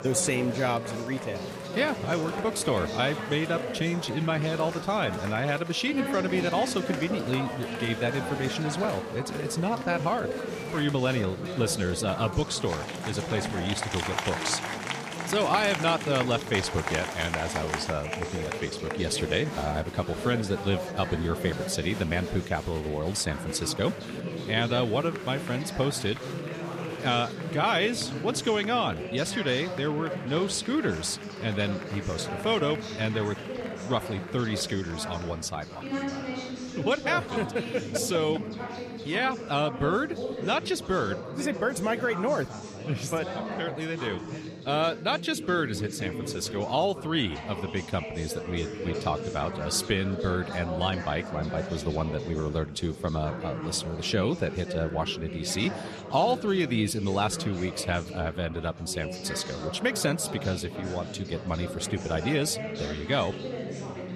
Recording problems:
chatter from many people; loud; throughout; 6 dB below the speech

